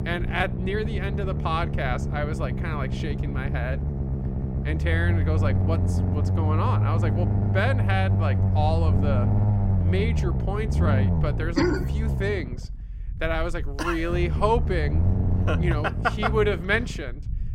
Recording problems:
low rumble; loud; throughout; 8 dB below the speech

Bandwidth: 16 kHz